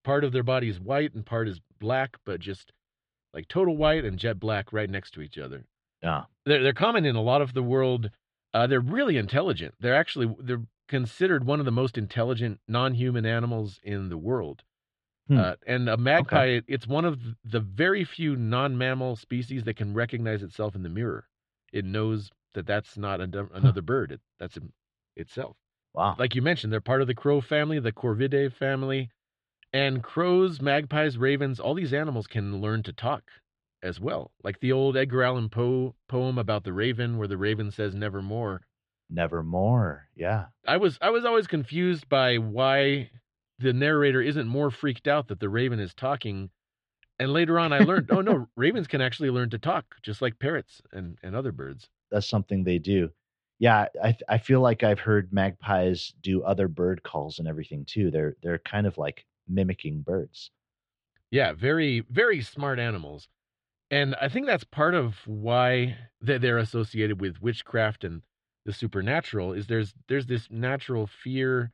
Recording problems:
muffled; slightly; fading above 3.5 kHz

